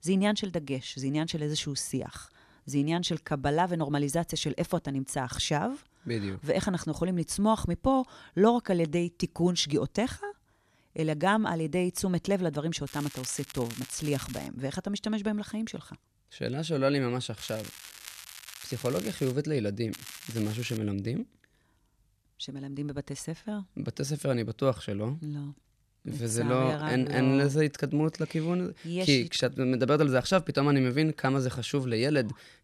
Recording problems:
crackling; noticeable; from 13 to 14 s, from 17 to 19 s and at 20 s; 15 dB below the speech

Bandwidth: 13.5 kHz